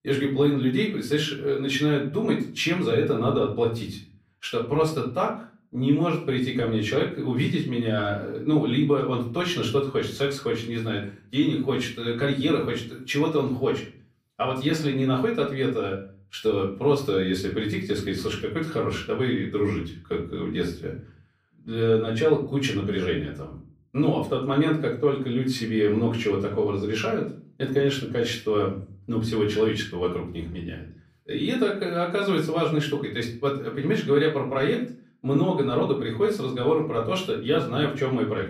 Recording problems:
off-mic speech; far
room echo; slight; dies away in 0.4 s

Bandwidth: 15 kHz